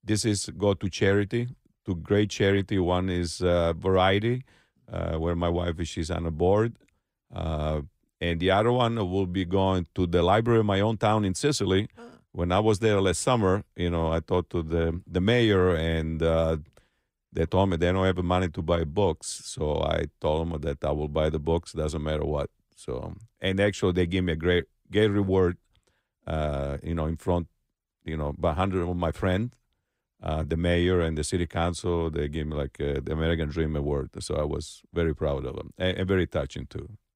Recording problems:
none

